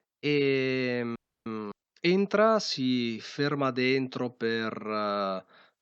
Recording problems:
audio freezing; at 1 s

